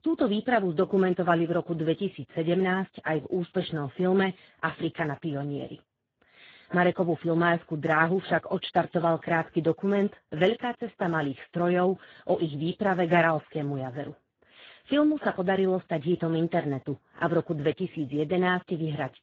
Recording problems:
garbled, watery; badly

